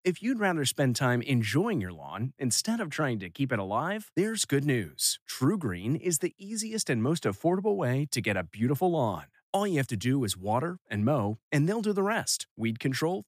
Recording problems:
none

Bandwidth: 15 kHz